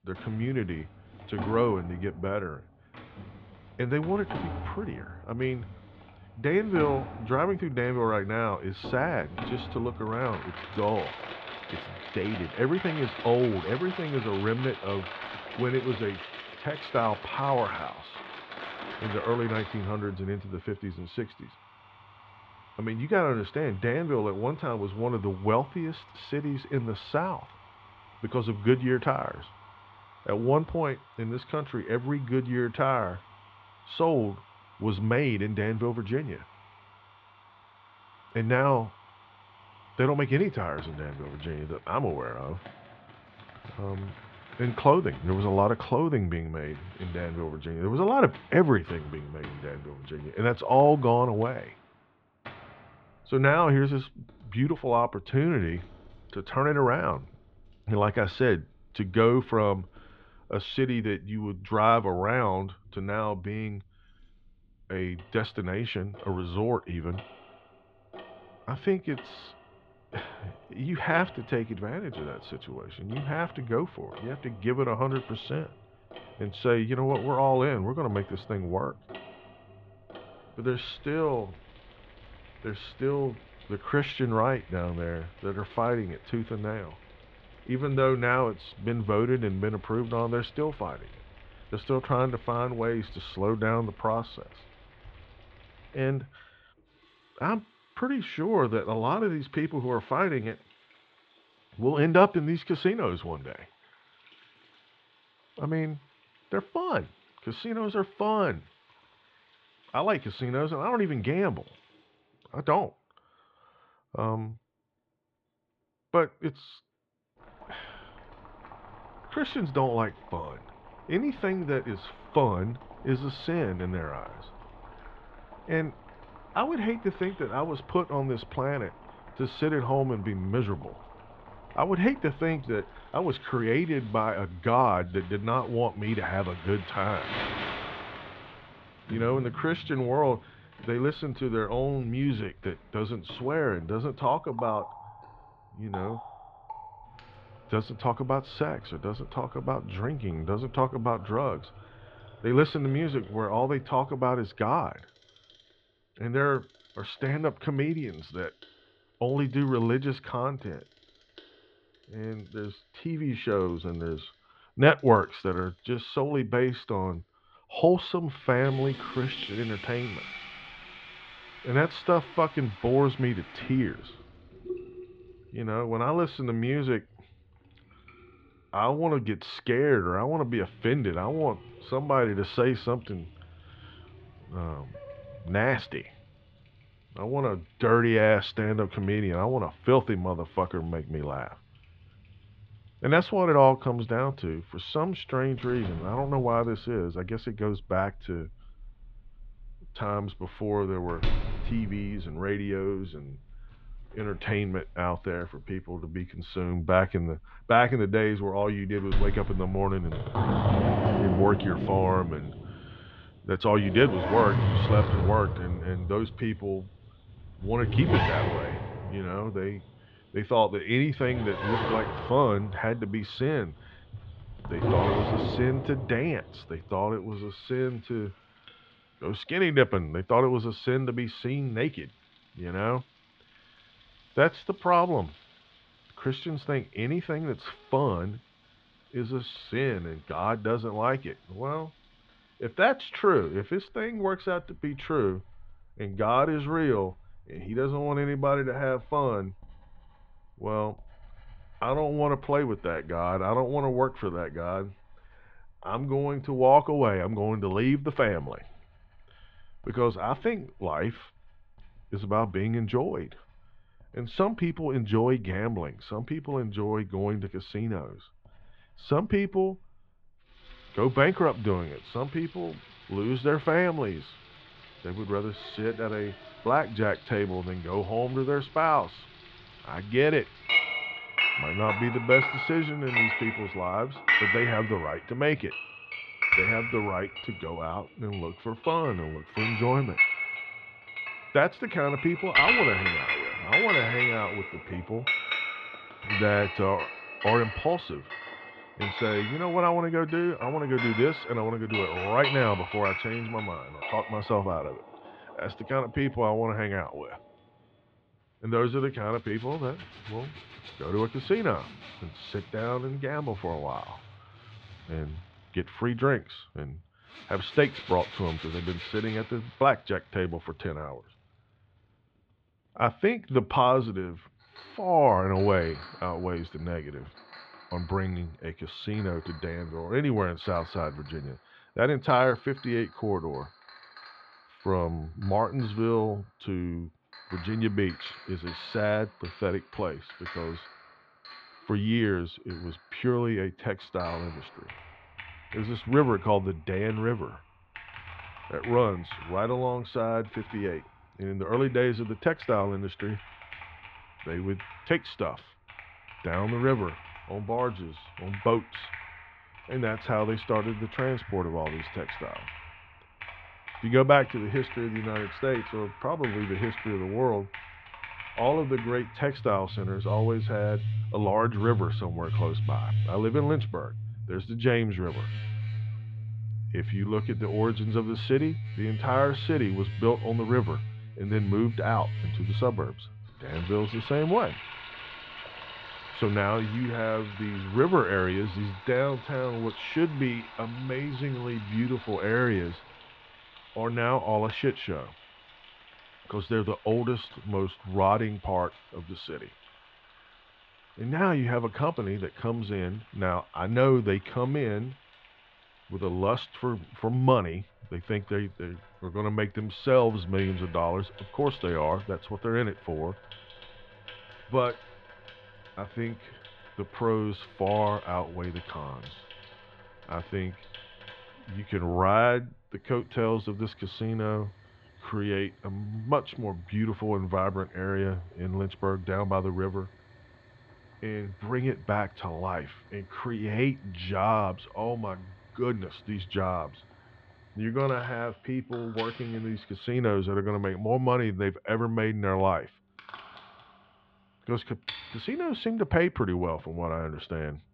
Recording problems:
muffled; slightly; fading above 3.5 kHz
household noises; loud; throughout; 6 dB below the speech

